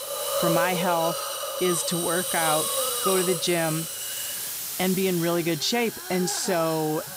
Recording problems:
hiss; loud; throughout; 2 dB below the speech

